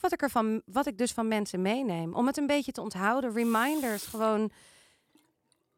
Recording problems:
household noises; noticeable; throughout; 15 dB below the speech

